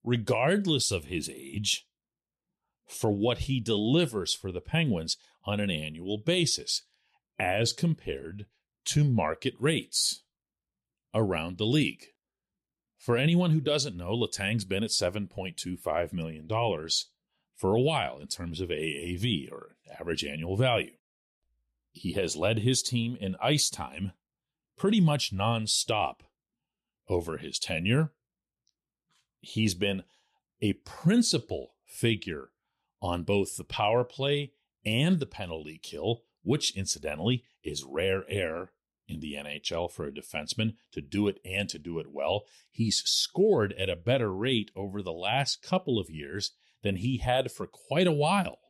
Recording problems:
none

